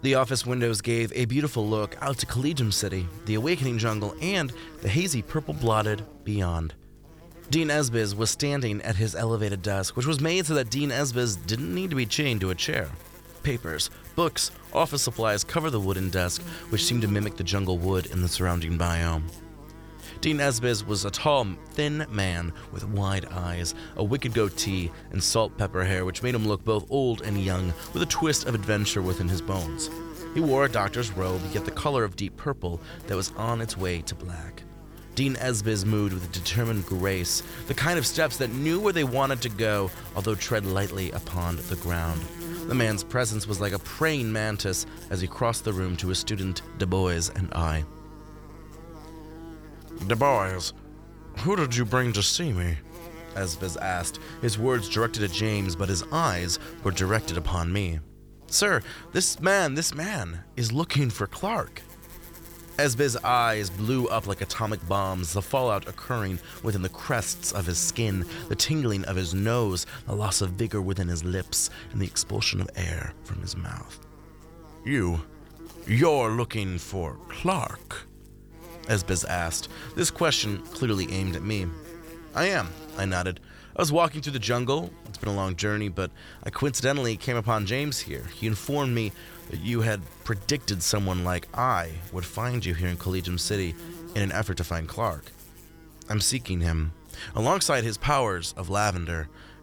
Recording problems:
electrical hum; noticeable; throughout; 50 Hz, 20 dB below the speech

